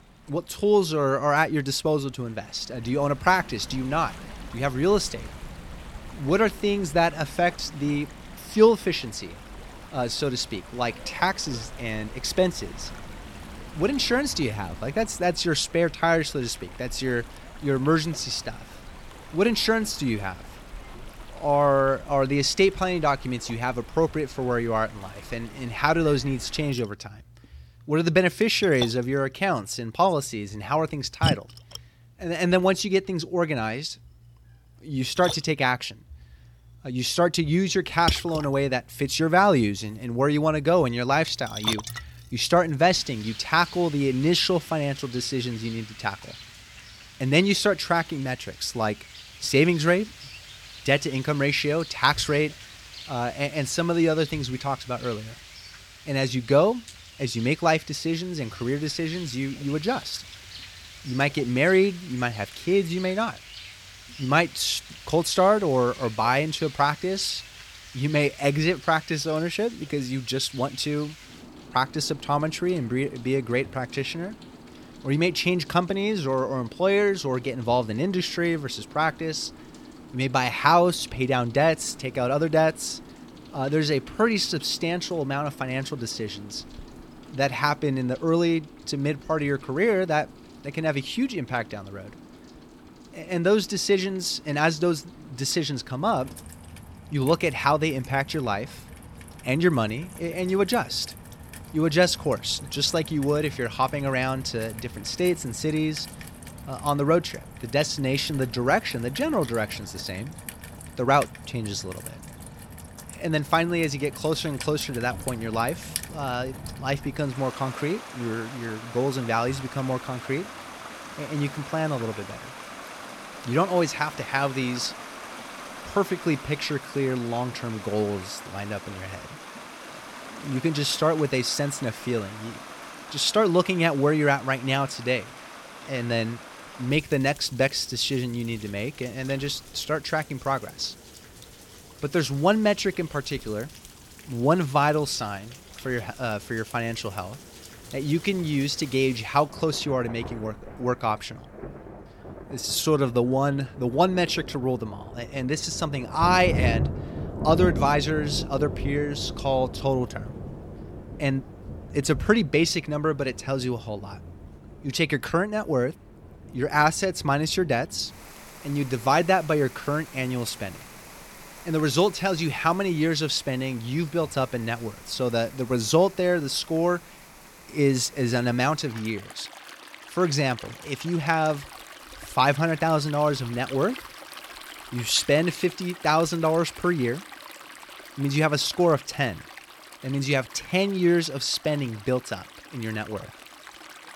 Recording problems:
rain or running water; noticeable; throughout; 15 dB below the speech

